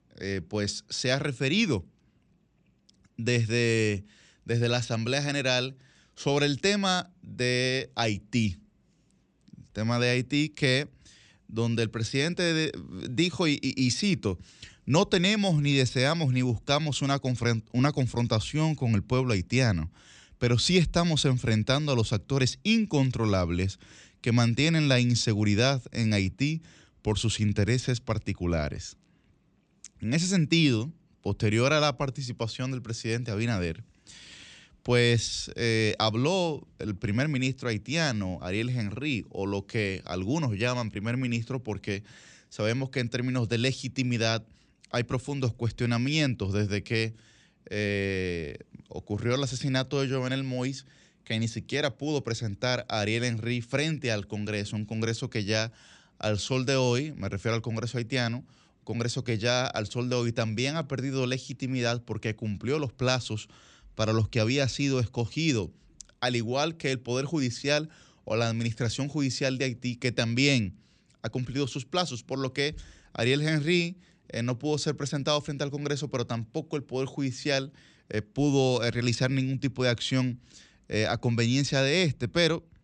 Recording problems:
none

